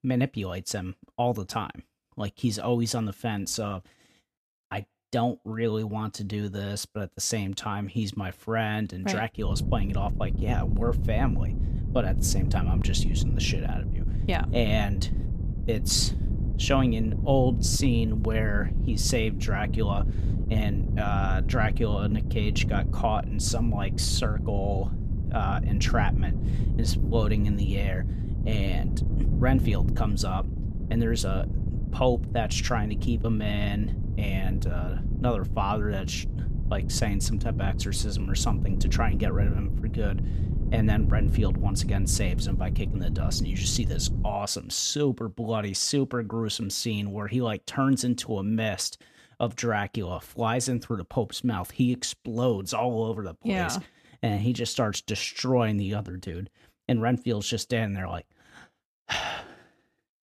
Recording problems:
wind noise on the microphone; occasional gusts; from 9.5 to 44 s; 10 dB below the speech

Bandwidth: 14.5 kHz